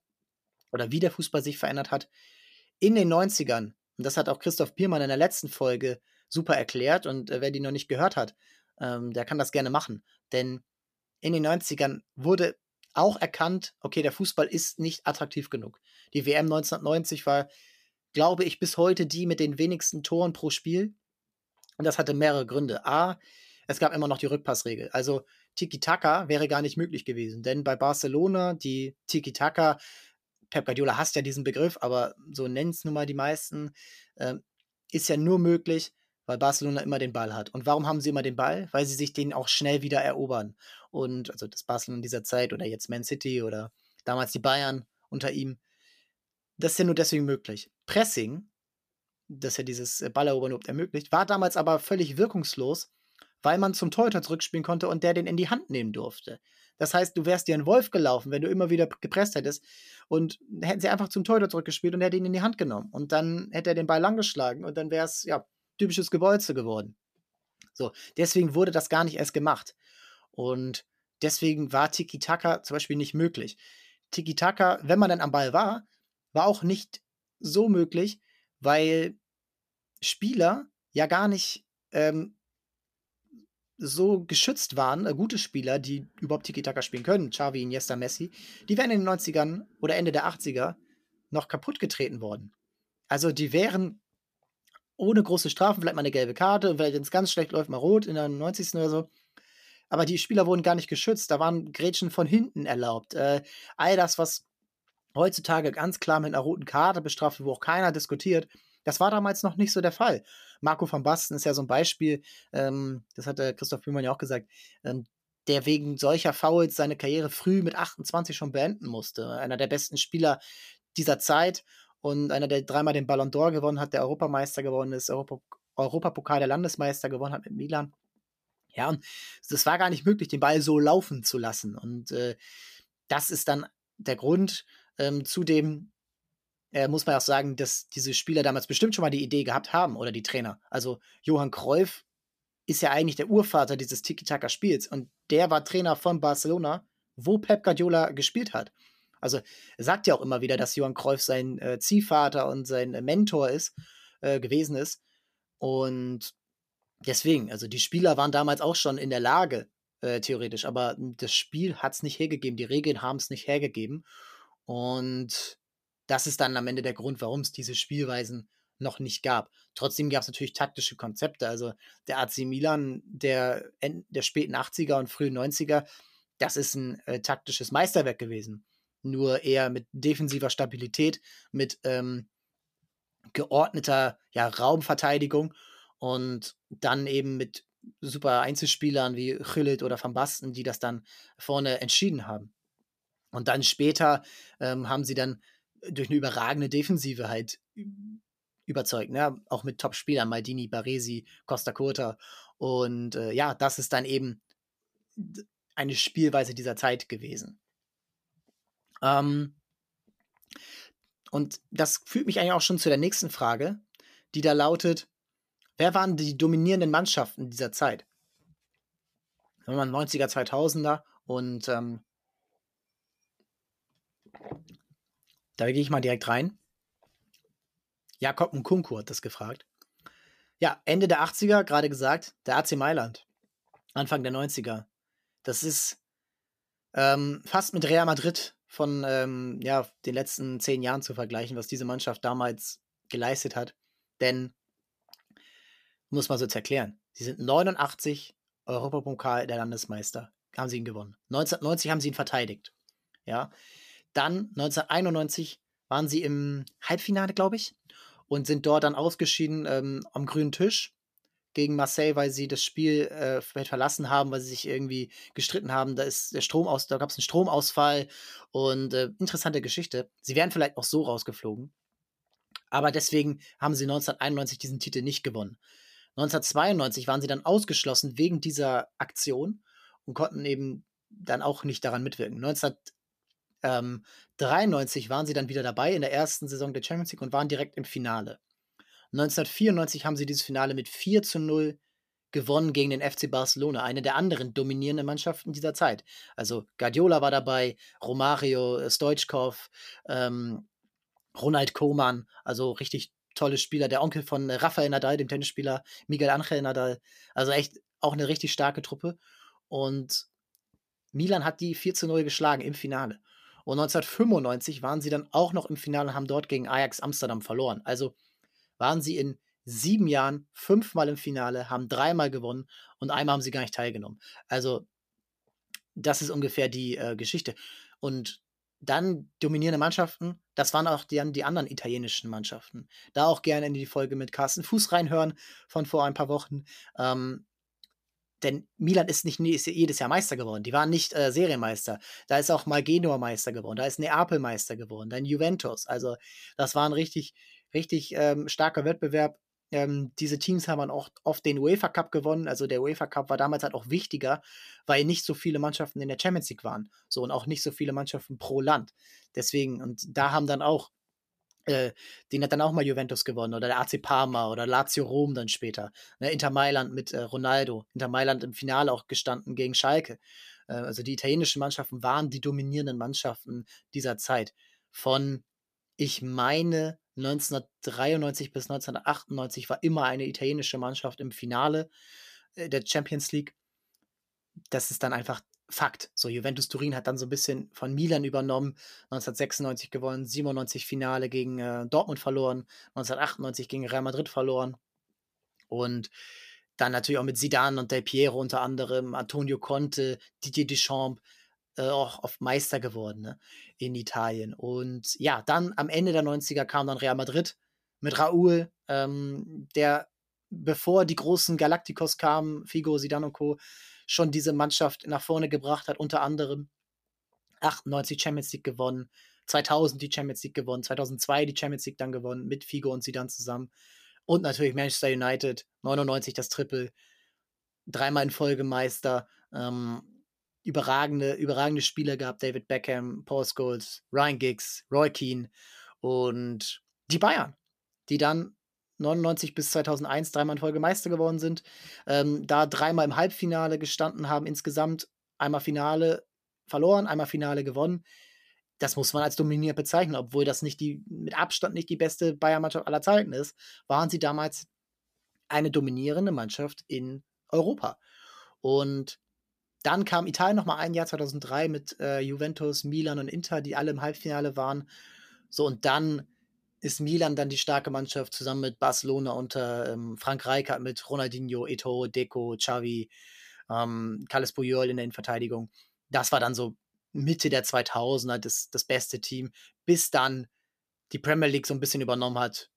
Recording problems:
none

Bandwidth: 14.5 kHz